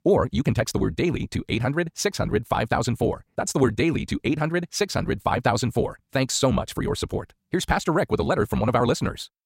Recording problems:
wrong speed, natural pitch; too fast; 1.8 times normal speed

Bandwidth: 16 kHz